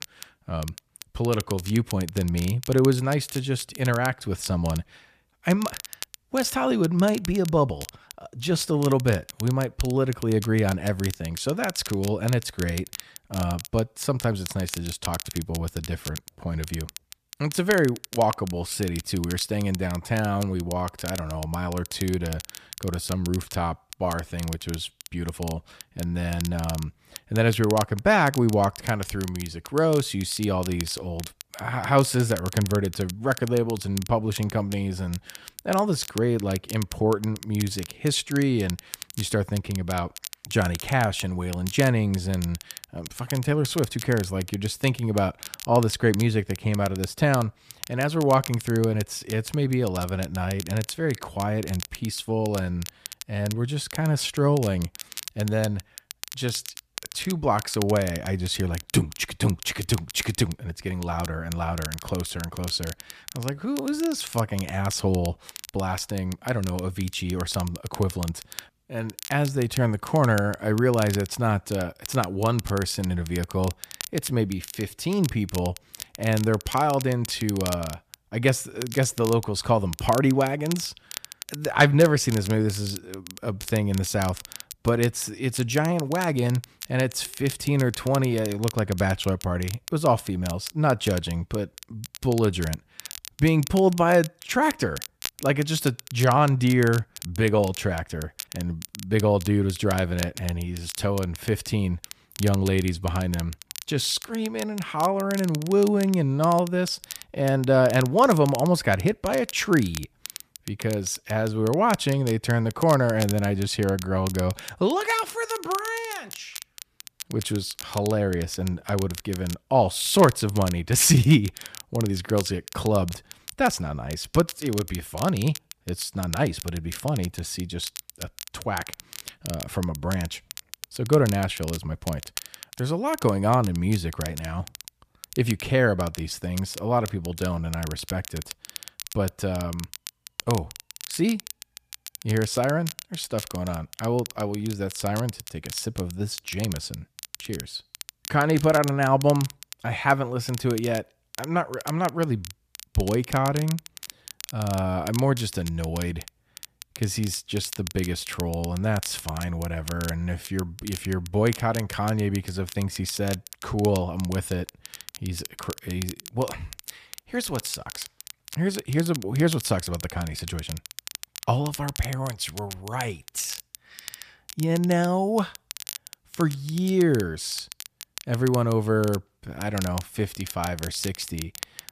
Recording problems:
crackle, like an old record; noticeable; 15 dB below the speech

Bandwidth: 14.5 kHz